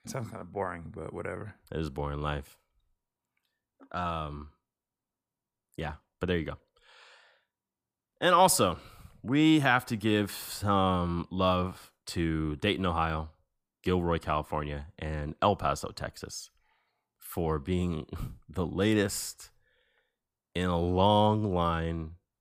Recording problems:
none

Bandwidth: 15 kHz